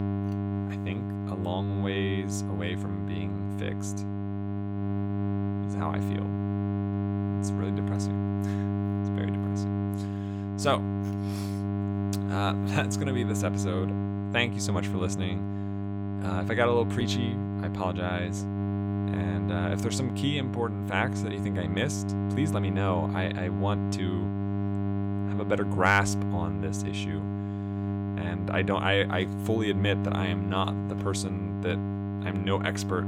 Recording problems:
electrical hum; loud; throughout; 50 Hz, 6 dB below the speech

